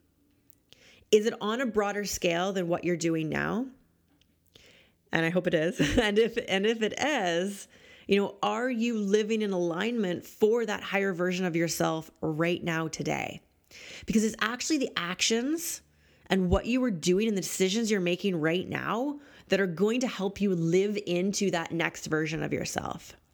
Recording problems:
none

